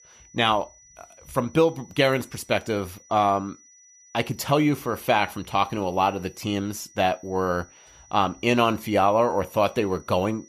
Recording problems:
high-pitched whine; faint; throughout; 6 kHz, 25 dB below the speech

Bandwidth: 14.5 kHz